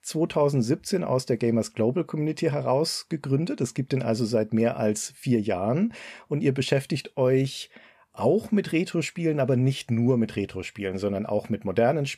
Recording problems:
none

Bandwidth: 14.5 kHz